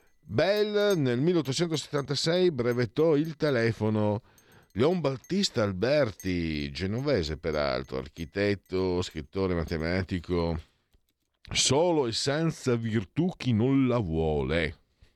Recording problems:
household noises; faint; until 12 s; 30 dB below the speech

